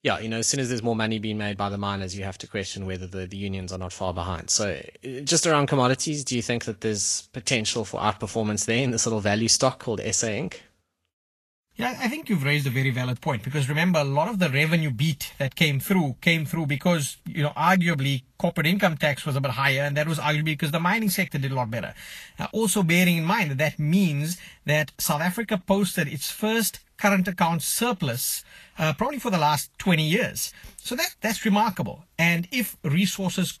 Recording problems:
garbled, watery; slightly; nothing above 13 kHz

